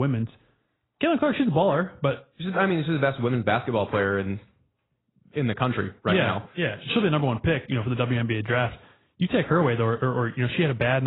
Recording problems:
garbled, watery; badly; nothing above 4 kHz
abrupt cut into speech; at the start and the end

